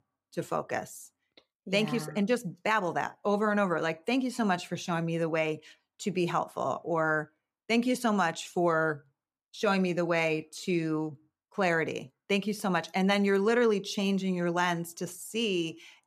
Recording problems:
none

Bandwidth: 14.5 kHz